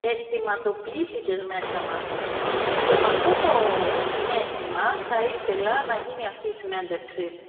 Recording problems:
phone-call audio; poor line; nothing above 3.5 kHz
off-mic speech; far
room echo; noticeable; dies away in 1.7 s
wind noise on the microphone; heavy; from 1.5 to 6 s; 1 dB above the speech

